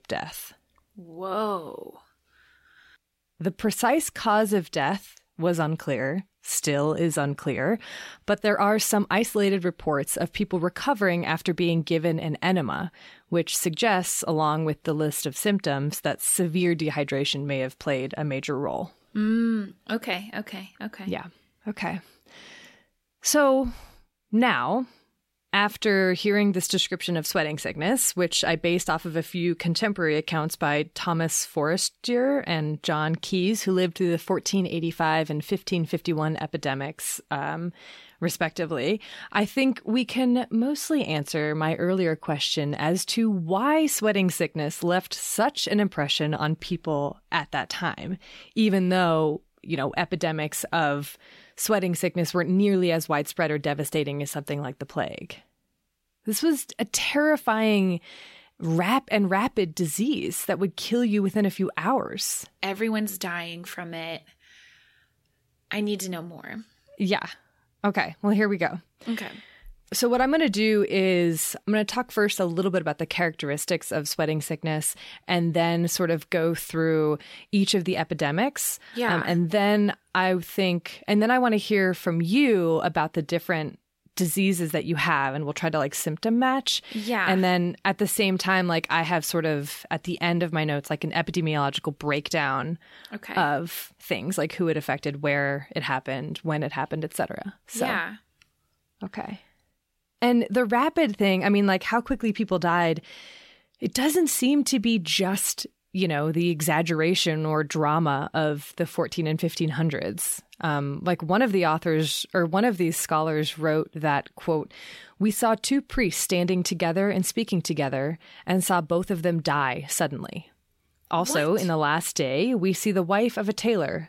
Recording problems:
none

